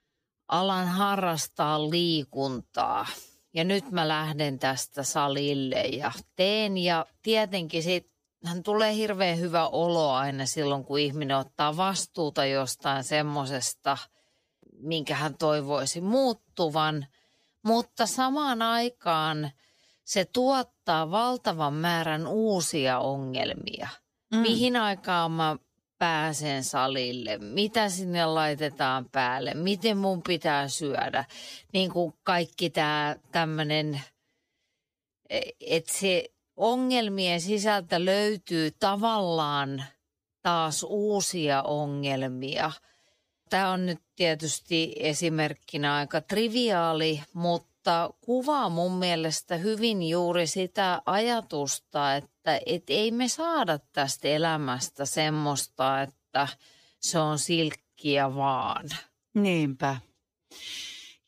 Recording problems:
wrong speed, natural pitch; too slow; 0.6 times normal speed

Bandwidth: 15 kHz